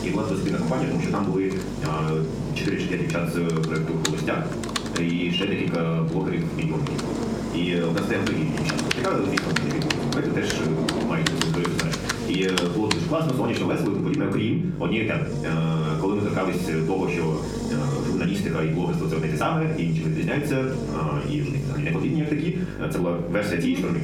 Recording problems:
off-mic speech; far
wrong speed, natural pitch; too fast; 1.5 times normal speed
room echo; slight; dies away in 0.4 s
squashed, flat; somewhat
household noises; loud; until 13 s; 5 dB below the speech
electrical hum; noticeable; throughout; 50 Hz, 10 dB below the speech

